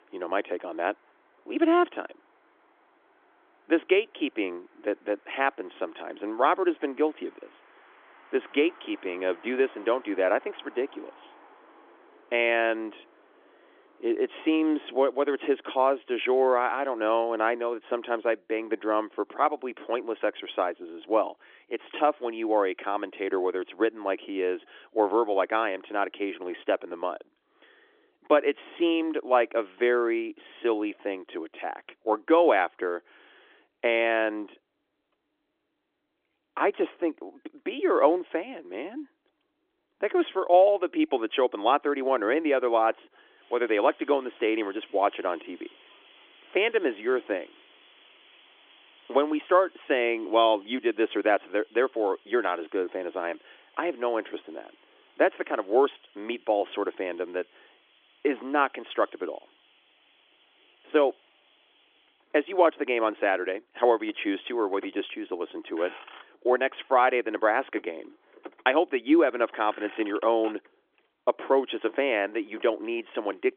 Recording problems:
phone-call audio; nothing above 3.5 kHz
traffic noise; faint; throughout; 25 dB below the speech

